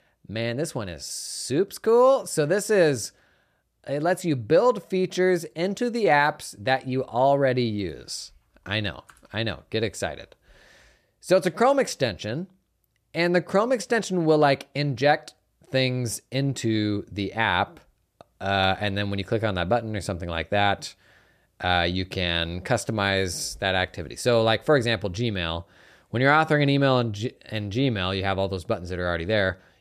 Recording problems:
none

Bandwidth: 14.5 kHz